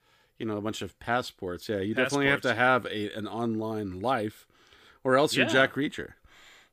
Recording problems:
none

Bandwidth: 15 kHz